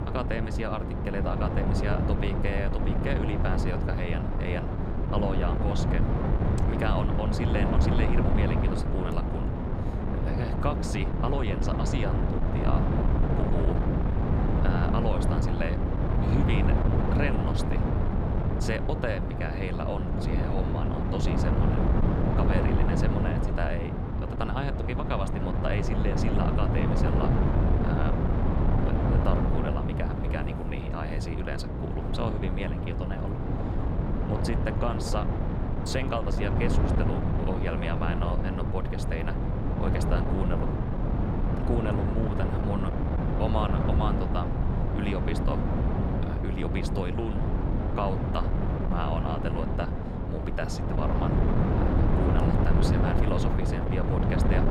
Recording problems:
wind noise on the microphone; heavy; 1 dB above the speech

